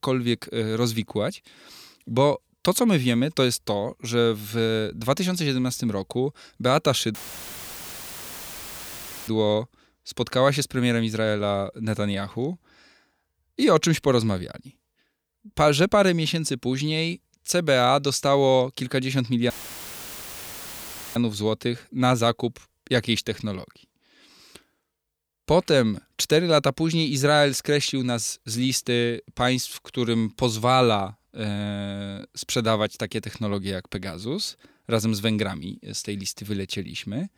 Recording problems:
audio cutting out; filled with static; at 7 s for 2 s and at 20 s for 1.5 s

